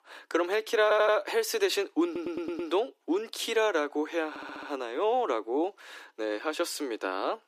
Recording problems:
thin; very; fading below 300 Hz
audio stuttering; at 1 s, at 2 s and at 4.5 s

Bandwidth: 14.5 kHz